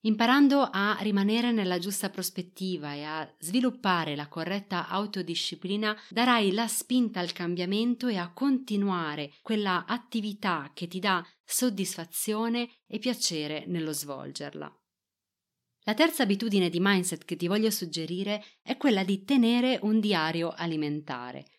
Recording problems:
none

